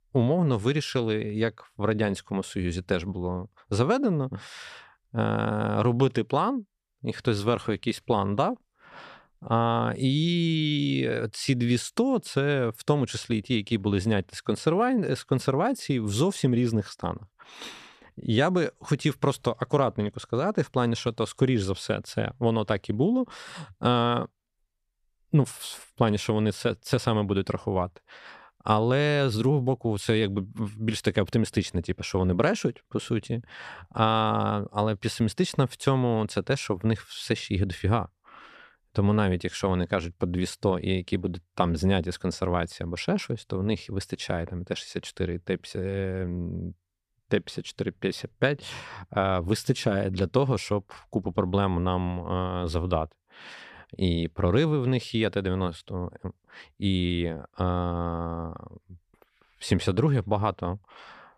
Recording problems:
none

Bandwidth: 14.5 kHz